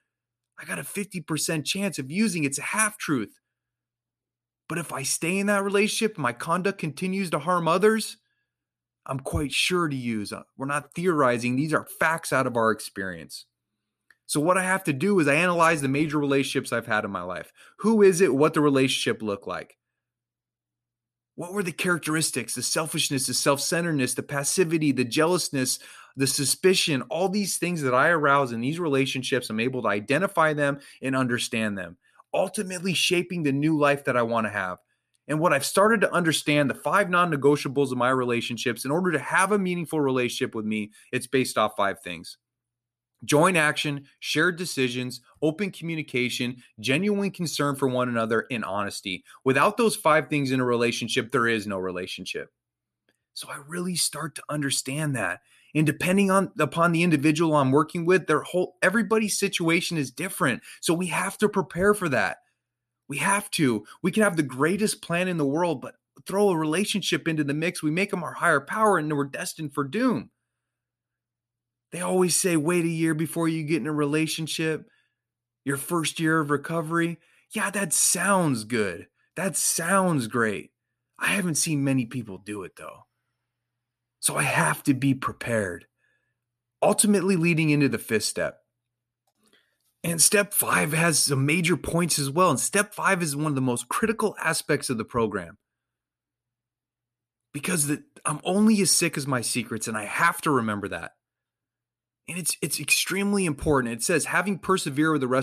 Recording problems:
abrupt cut into speech; at the end

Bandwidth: 14.5 kHz